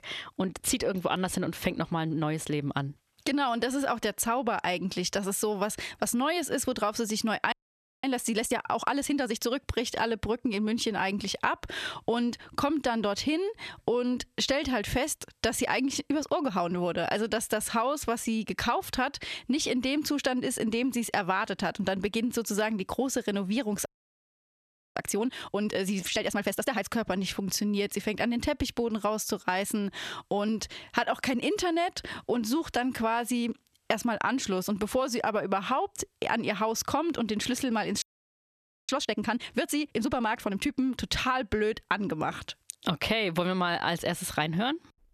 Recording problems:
squashed, flat; heavily
audio freezing; at 7.5 s for 0.5 s, at 24 s for 1 s and at 38 s for 1 s

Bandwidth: 13.5 kHz